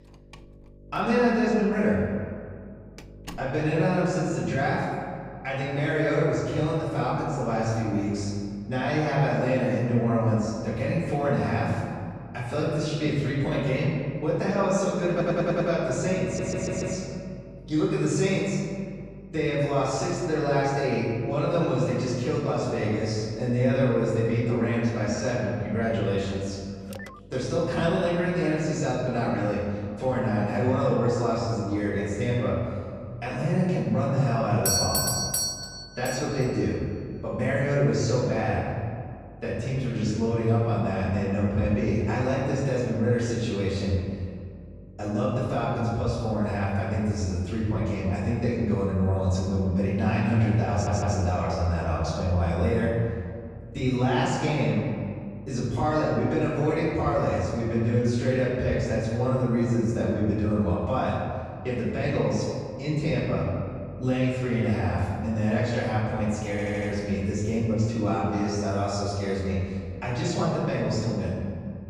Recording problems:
room echo; strong; dies away in 1.9 s
off-mic speech; far
electrical hum; faint; throughout; 50 Hz, 25 dB below the speech
door banging; faint; until 3.5 s; peak 15 dB below the speech
audio stuttering; 4 times, first at 15 s
phone ringing; faint; at 27 s; peak 15 dB below the speech
doorbell; loud; from 35 to 36 s; peak 4 dB above the speech

